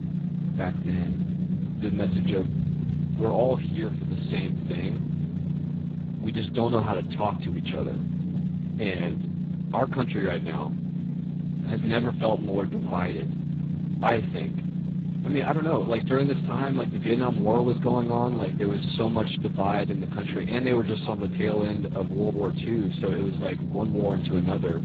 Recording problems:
garbled, watery; badly; nothing above 4 kHz
low rumble; loud; throughout; 9 dB below the speech

